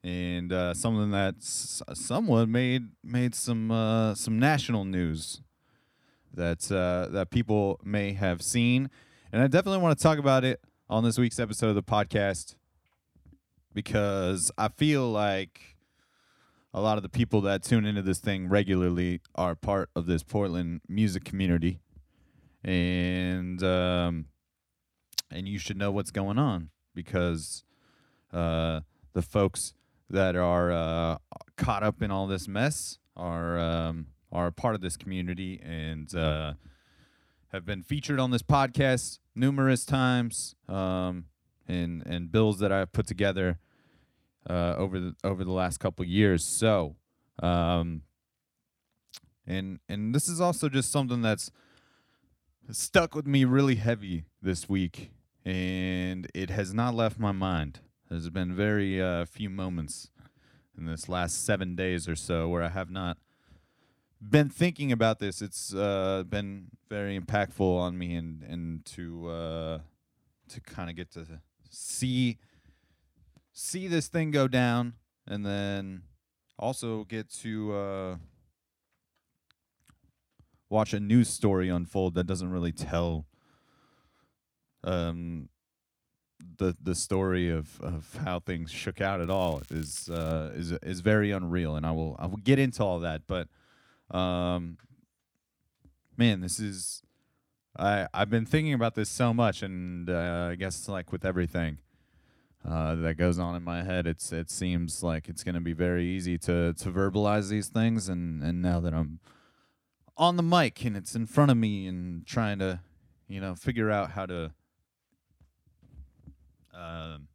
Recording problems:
crackling; faint; from 1:29 to 1:30; 25 dB below the speech

